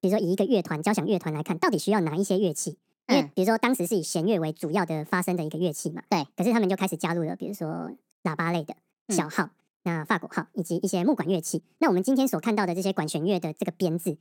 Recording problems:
wrong speed and pitch; too fast and too high; 1.6 times normal speed

